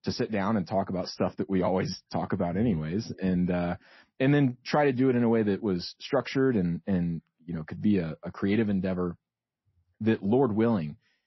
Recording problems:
garbled, watery; slightly; nothing above 5.5 kHz

